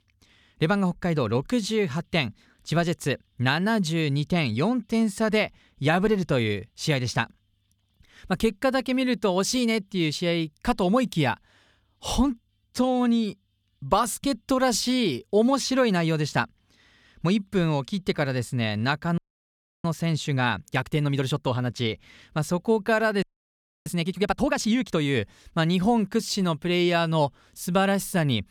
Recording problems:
audio freezing; at 19 s for 0.5 s and at 23 s for 0.5 s

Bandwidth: 19 kHz